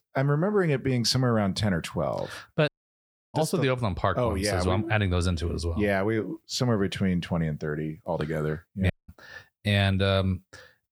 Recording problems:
audio cutting out; at 2.5 s for 0.5 s and at 9 s

